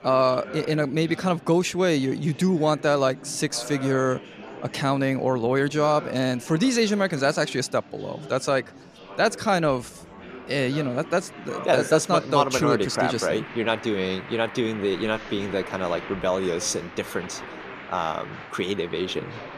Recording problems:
murmuring crowd; noticeable; throughout; 15 dB below the speech

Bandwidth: 14.5 kHz